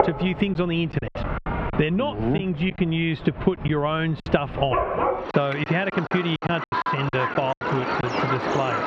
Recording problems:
muffled; slightly; fading above 3 kHz
squashed, flat; somewhat
animal sounds; loud; throughout; 3 dB below the speech
choppy; very; 9% of the speech affected

